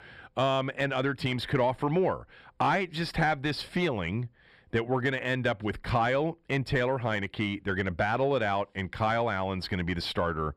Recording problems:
distortion; slight; 10 dB below the speech

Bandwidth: 14 kHz